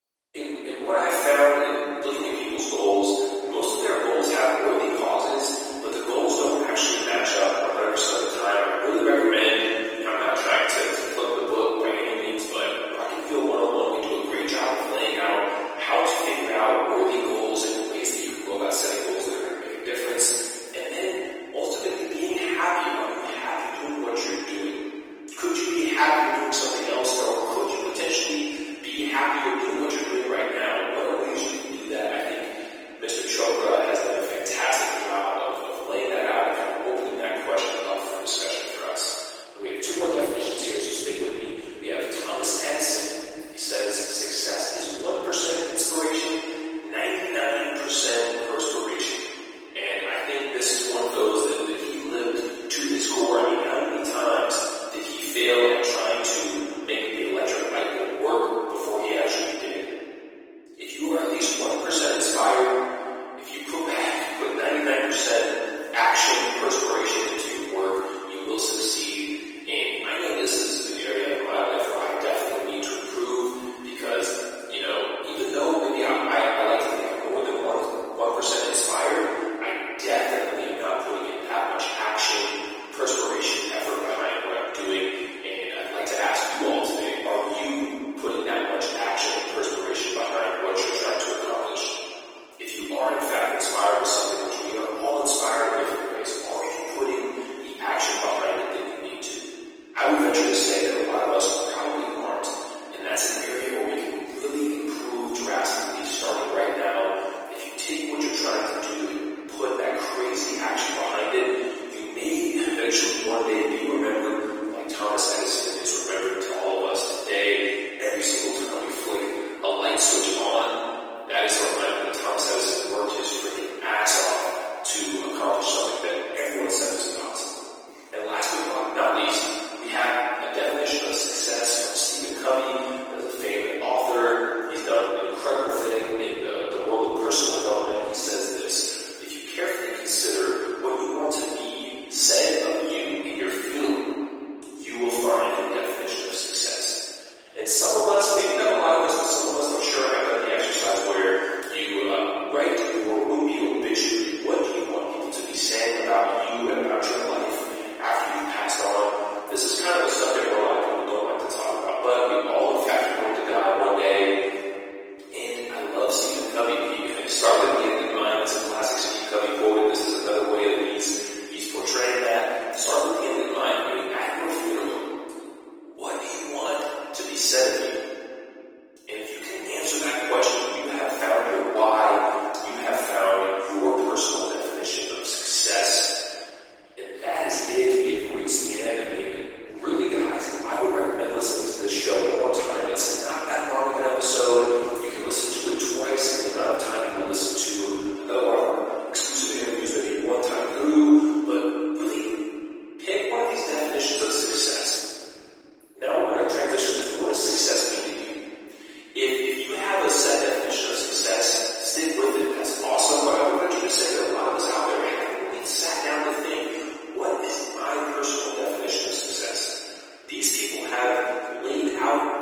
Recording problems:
room echo; strong; dies away in 2.7 s
off-mic speech; far
thin; somewhat; fading below 300 Hz
garbled, watery; slightly

